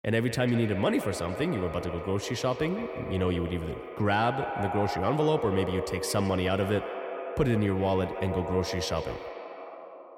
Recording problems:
echo of what is said; strong; throughout; 150 ms later, 7 dB below the speech

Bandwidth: 17 kHz